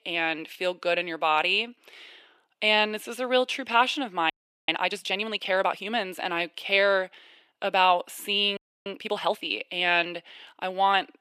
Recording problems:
thin; somewhat; fading below 400 Hz
audio freezing; at 4.5 s and at 8.5 s

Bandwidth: 14.5 kHz